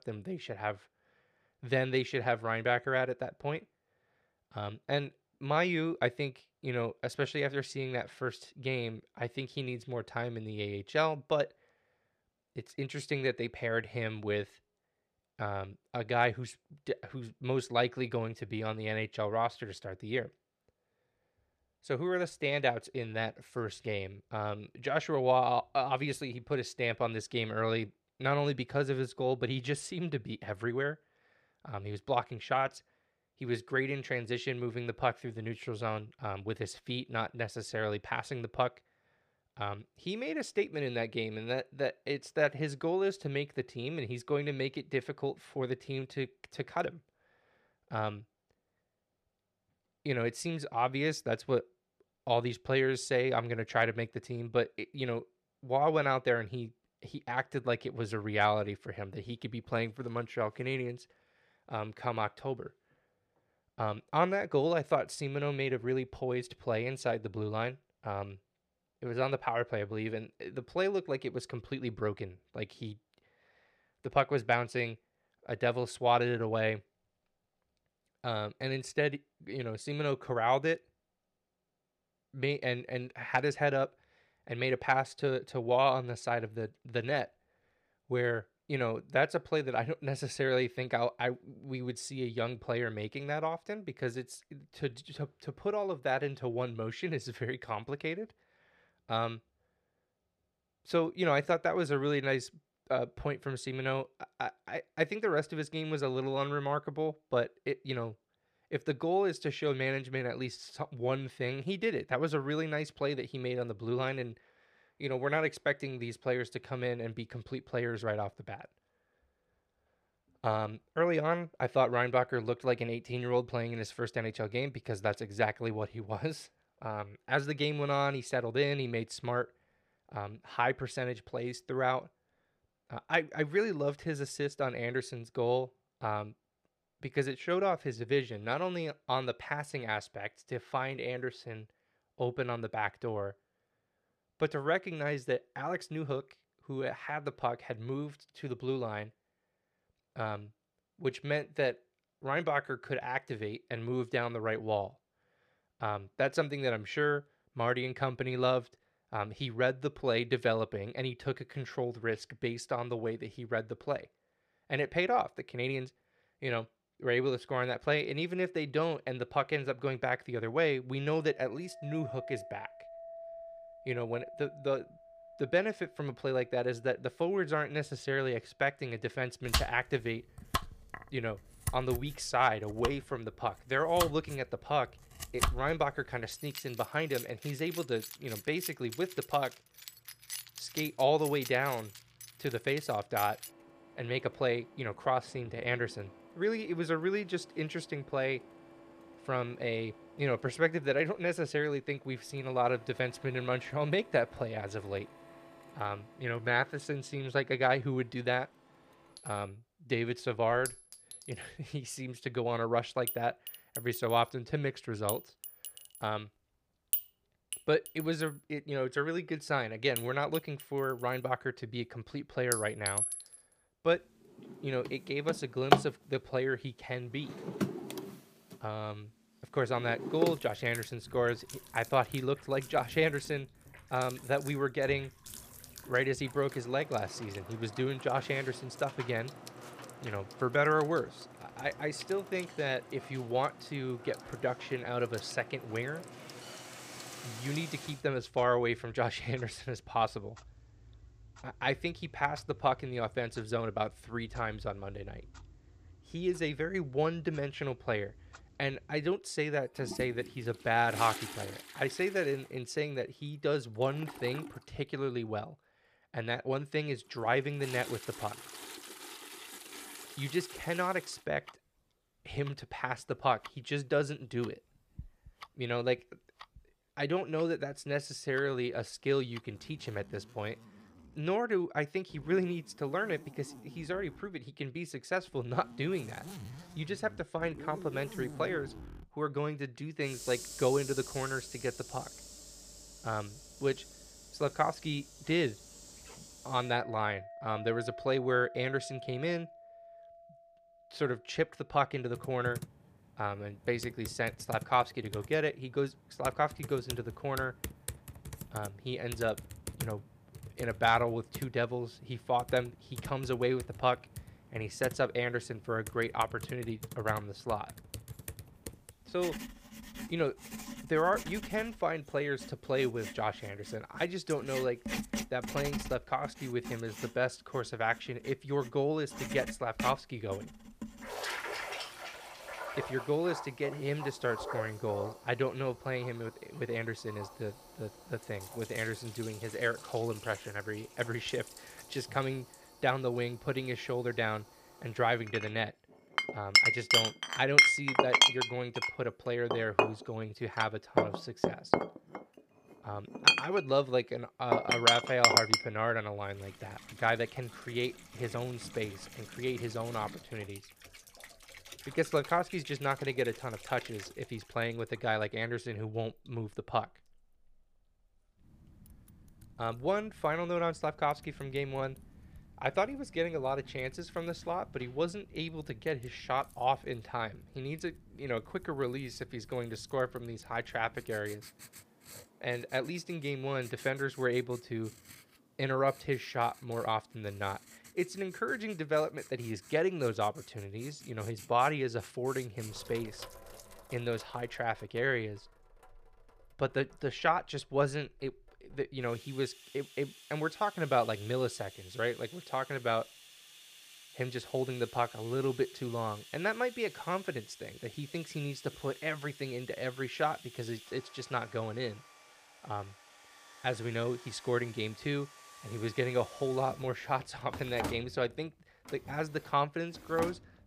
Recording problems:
household noises; loud; from 2:52 on; 3 dB below the speech

